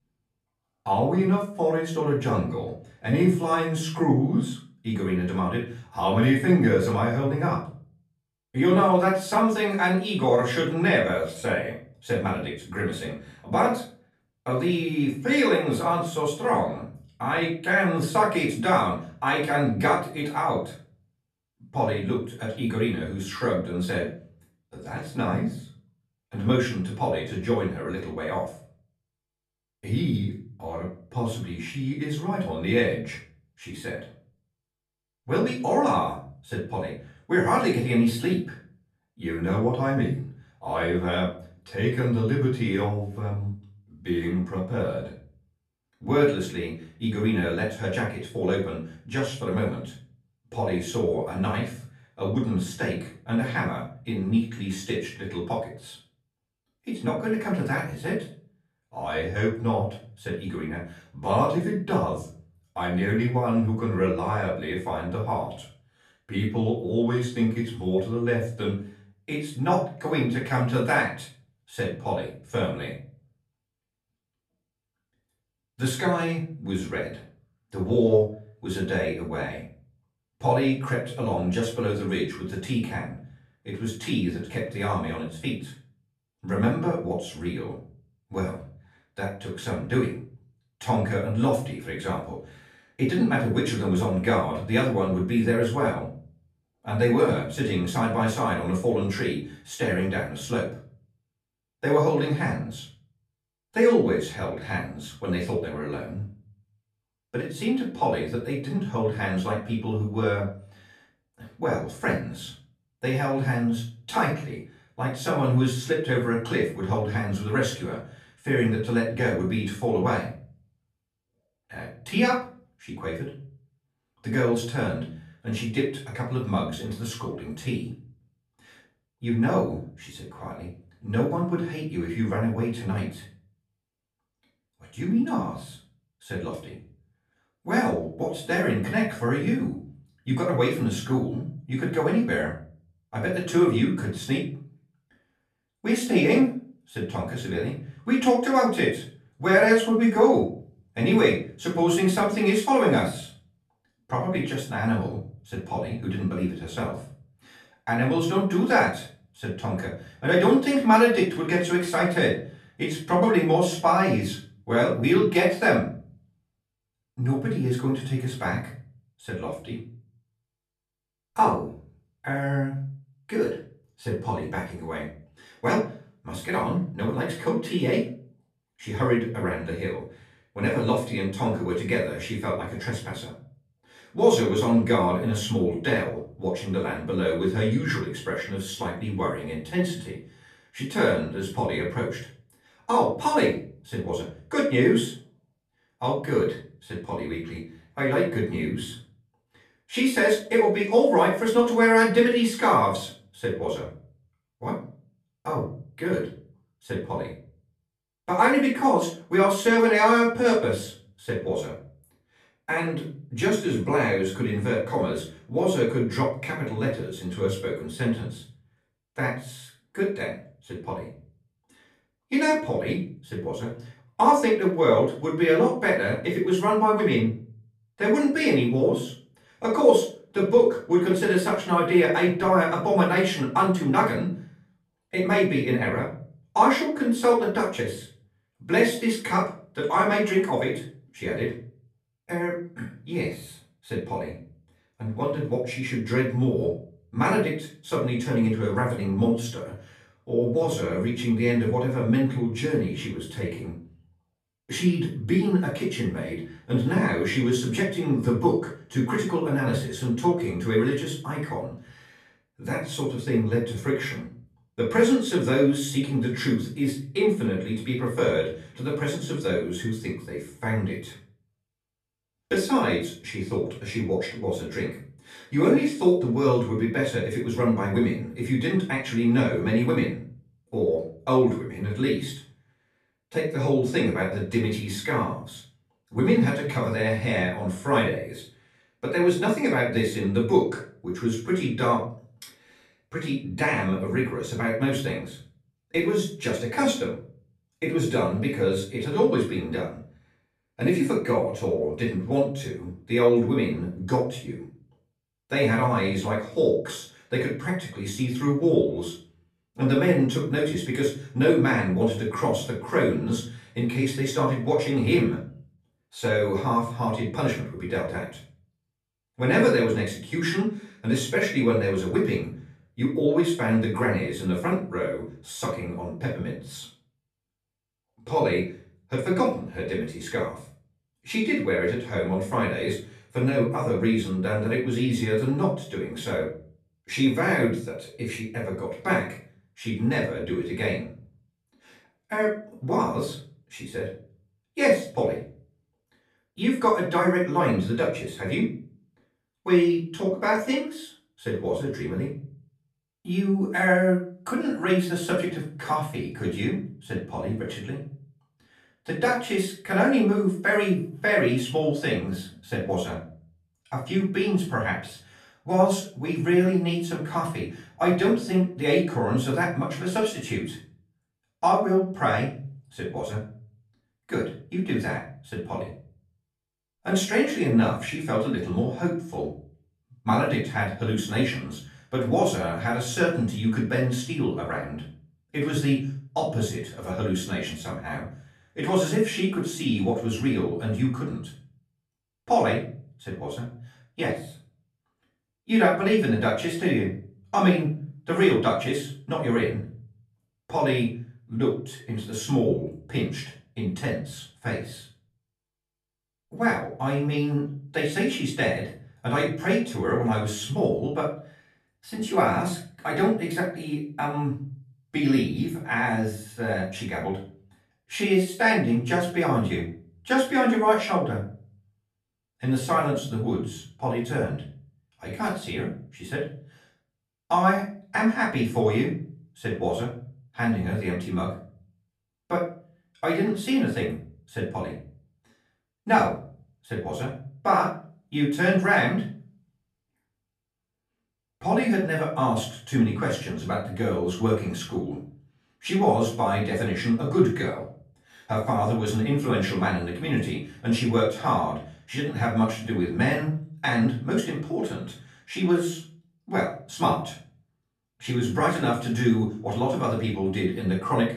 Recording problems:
off-mic speech; far
room echo; noticeable; dies away in 0.4 s

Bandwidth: 13.5 kHz